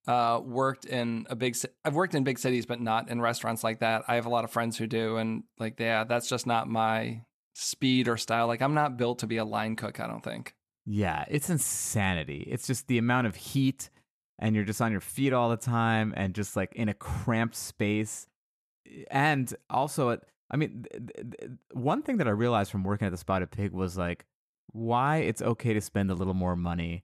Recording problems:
audio stuttering; at 21 s

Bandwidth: 13.5 kHz